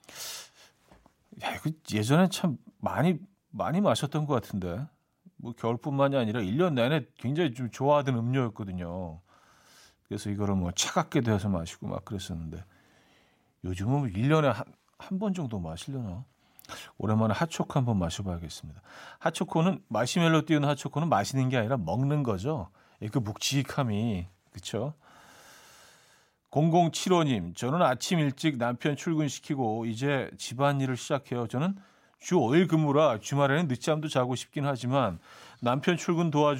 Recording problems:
abrupt cut into speech; at the end

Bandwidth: 16 kHz